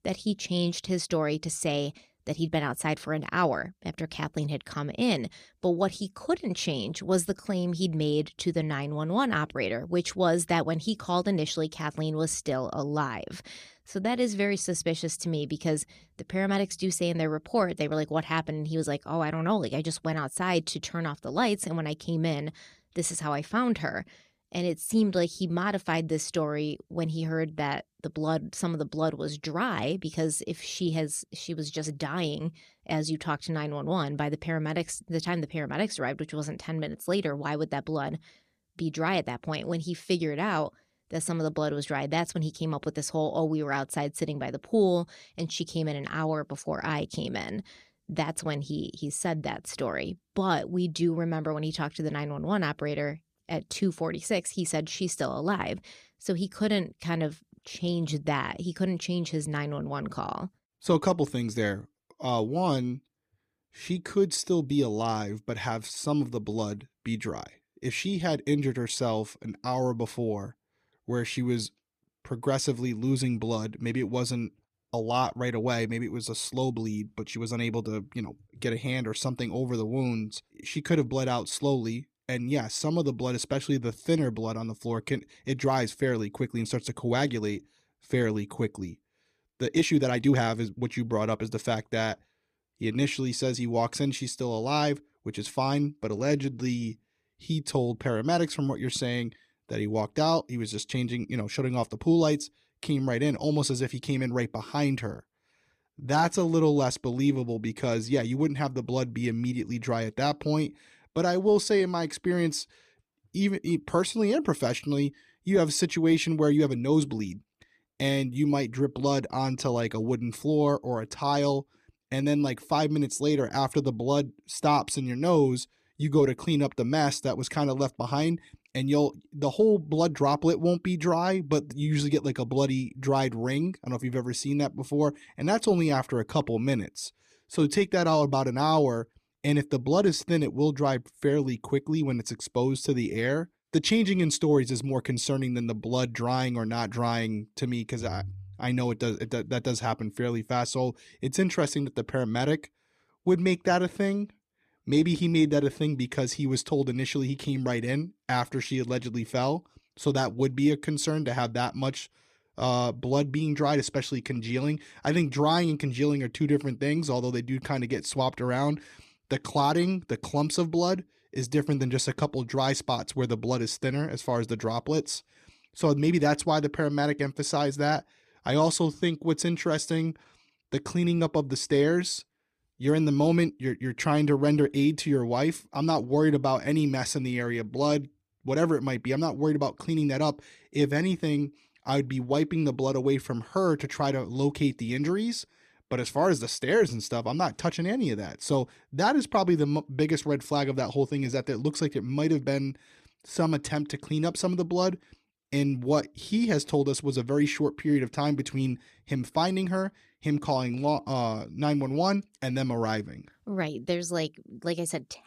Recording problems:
uneven, jittery; strongly; from 14 s to 3:31

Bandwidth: 14.5 kHz